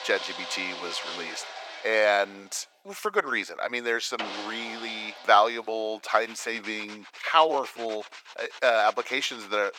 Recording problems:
thin; very; fading below 500 Hz
machinery noise; noticeable; throughout; 10 dB below the speech

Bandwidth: 17.5 kHz